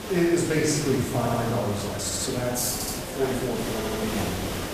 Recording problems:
off-mic speech; far
room echo; noticeable; dies away in 0.9 s
hiss; loud; throughout; 7 dB below the speech
chatter from many people; noticeable; throughout; 15 dB below the speech
uneven, jittery; strongly; from 0.5 to 4 s
audio stuttering; 4 times, first at 1 s

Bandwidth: 14.5 kHz